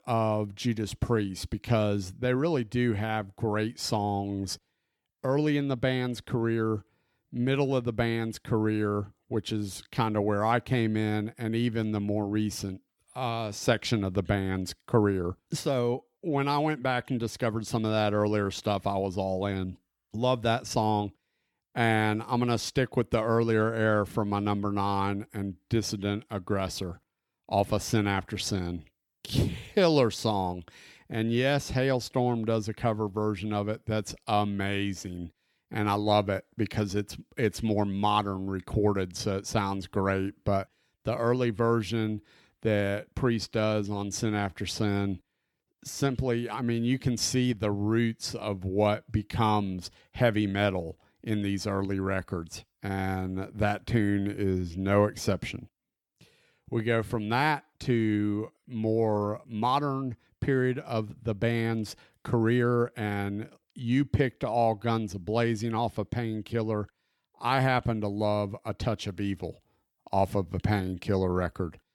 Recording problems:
none

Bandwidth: 18.5 kHz